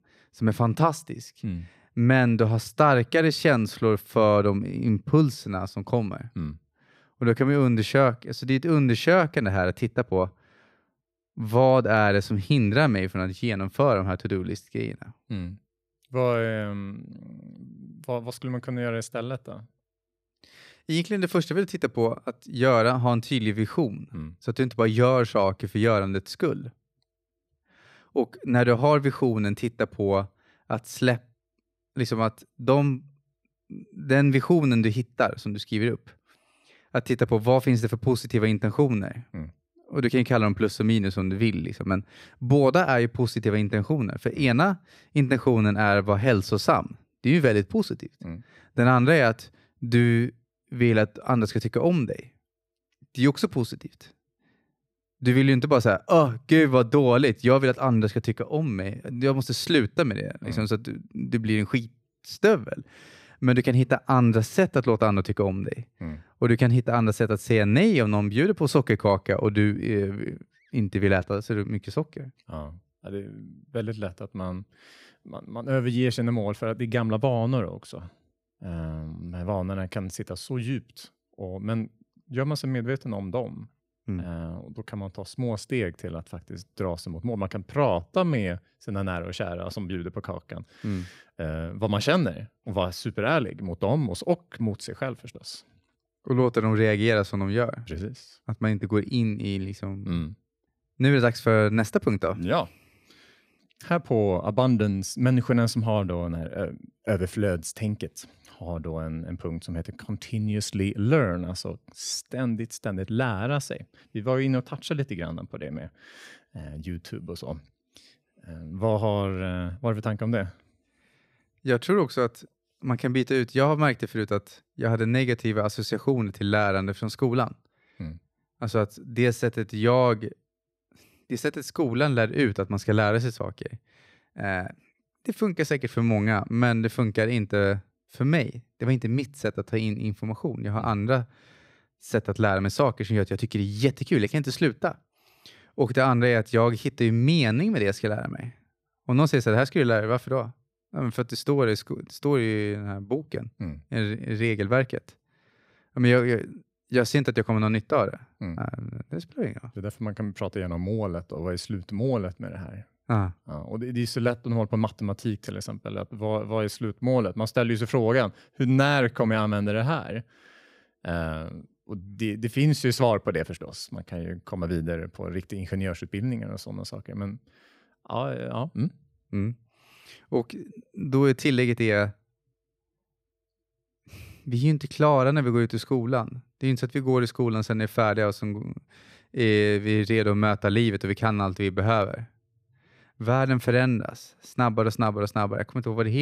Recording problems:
abrupt cut into speech; at the end

